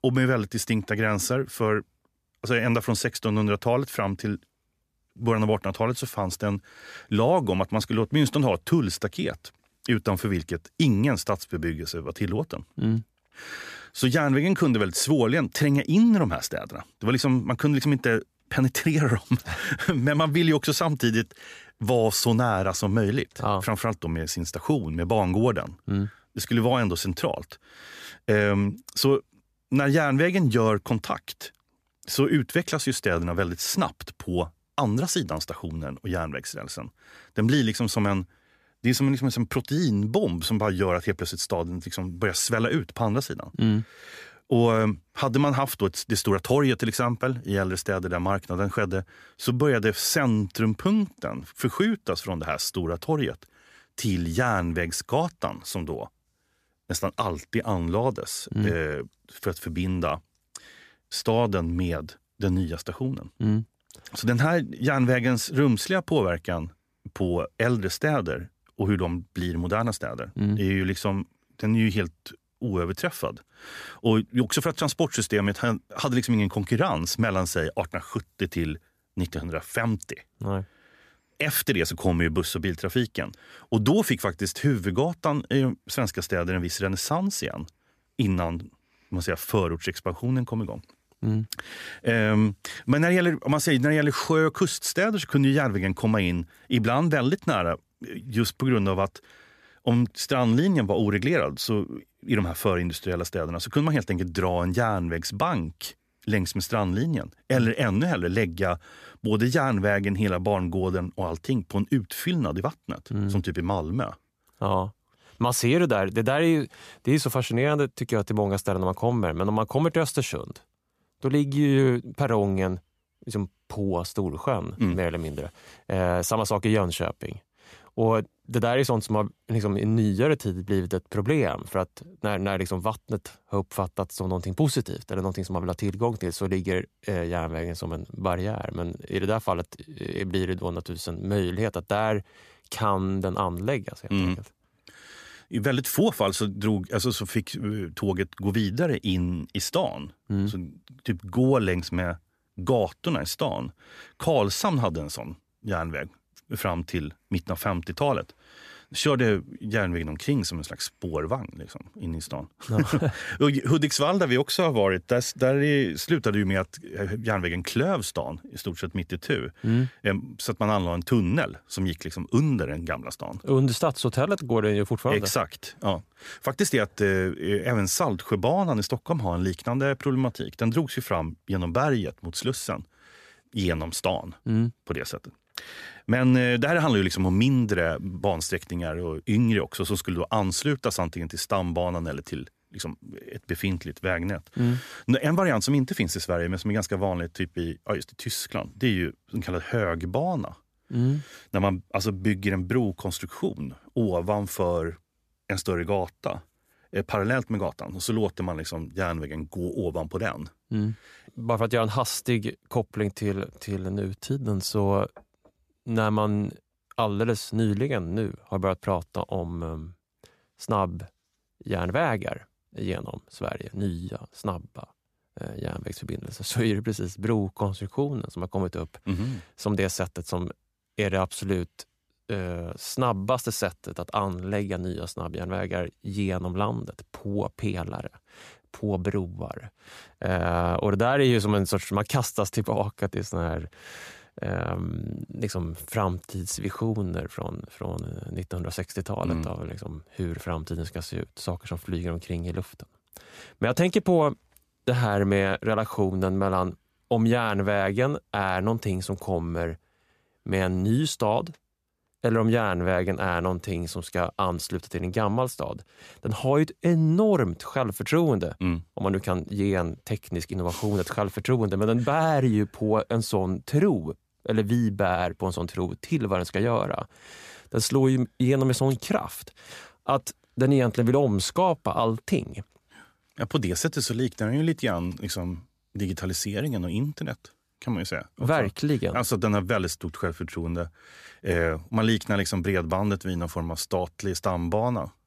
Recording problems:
none

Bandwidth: 14.5 kHz